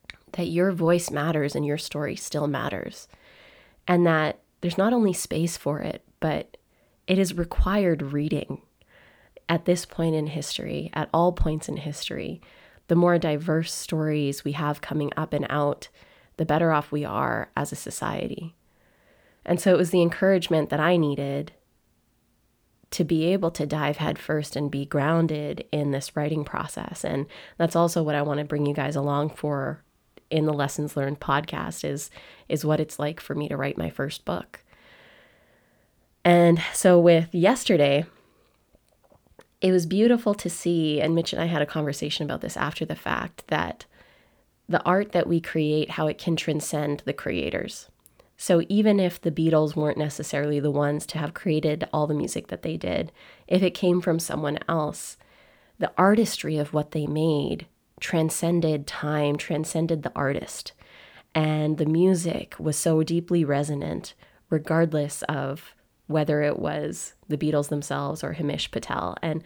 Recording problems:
none

